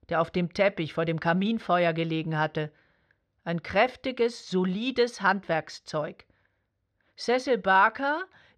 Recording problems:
muffled; slightly; fading above 4 kHz

